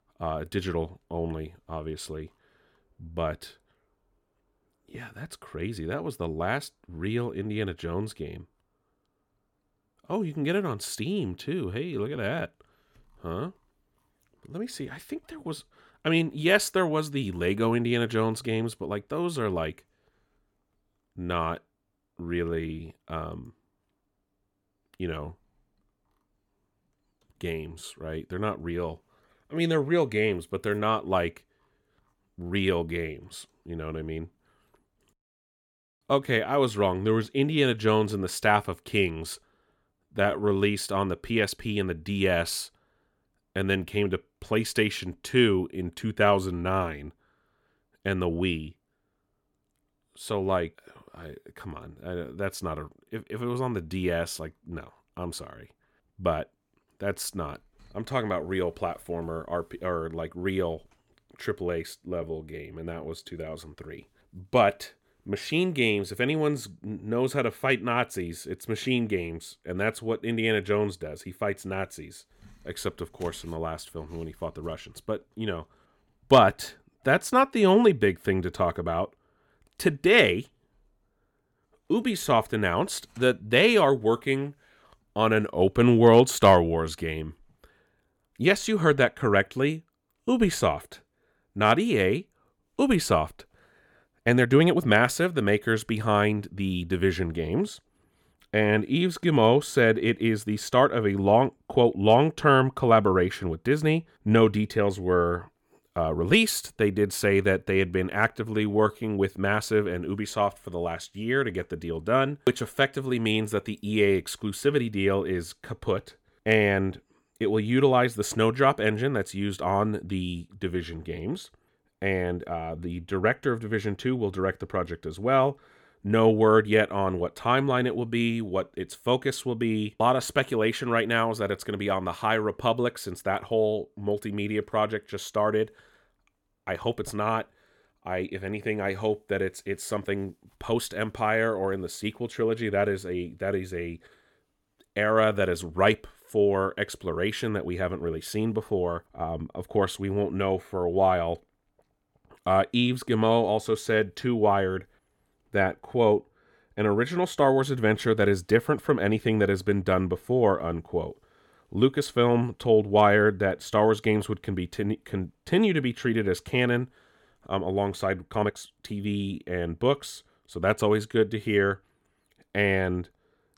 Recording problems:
uneven, jittery; strongly; from 22 s to 2:49

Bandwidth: 17.5 kHz